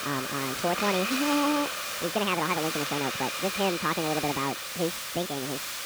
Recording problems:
high frequencies cut off; severe; nothing above 4 kHz
wrong speed and pitch; too fast and too high; 1.6 times normal speed
hiss; loud; throughout; 1 dB below the speech
crackle, like an old record; very faint; 25 dB below the speech

